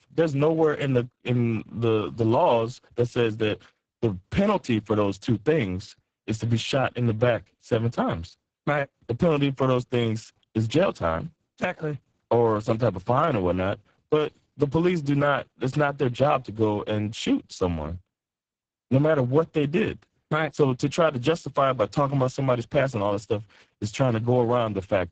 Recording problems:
garbled, watery; badly; nothing above 7.5 kHz

